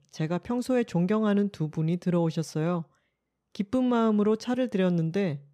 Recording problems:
none

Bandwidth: 14.5 kHz